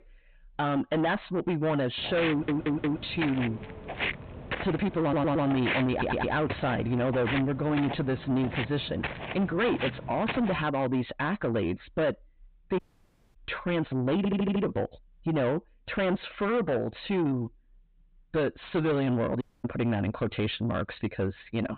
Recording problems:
distortion; heavy; 7 dB below the speech
high frequencies cut off; severe; nothing above 4 kHz
footsteps; noticeable; from 2 to 11 s; peak 1 dB below the speech
audio stuttering; 4 times, first at 2.5 s
audio cutting out; at 13 s for 0.5 s and at 19 s

